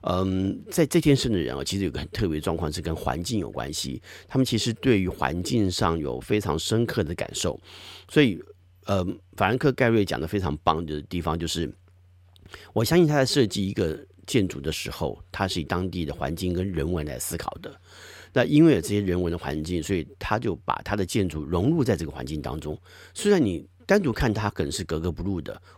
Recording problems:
none

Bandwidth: 16.5 kHz